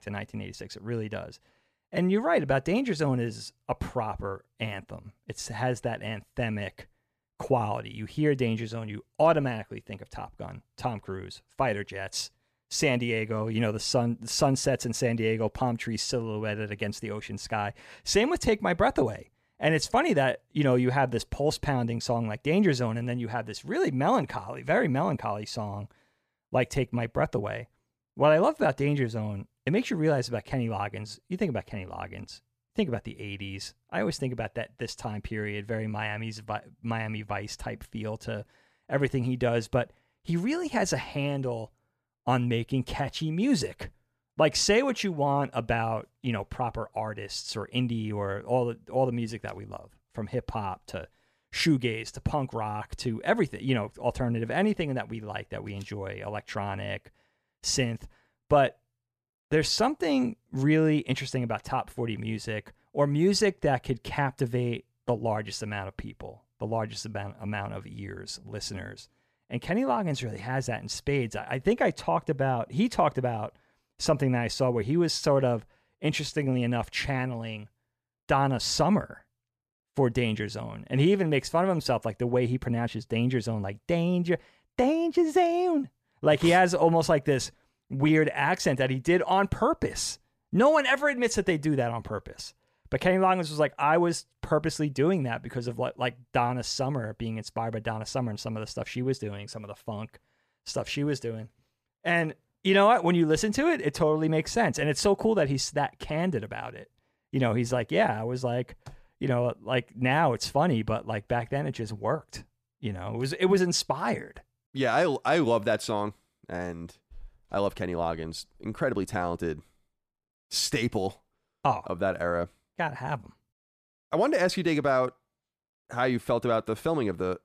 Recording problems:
none

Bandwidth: 14.5 kHz